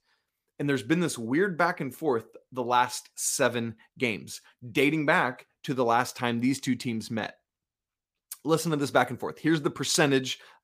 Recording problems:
none

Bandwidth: 15 kHz